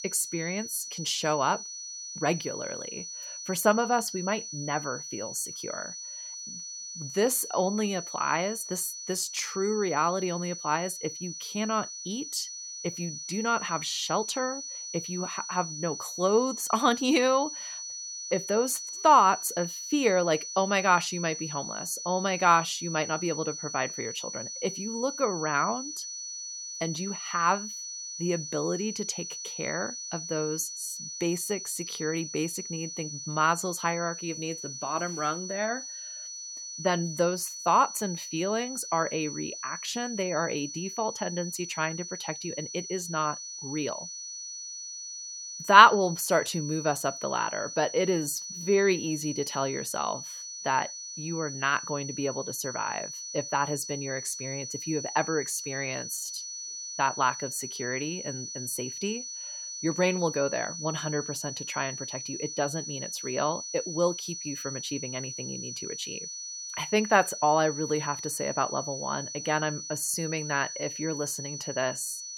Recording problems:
high-pitched whine; loud; throughout; 6 kHz, 7 dB below the speech

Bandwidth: 17 kHz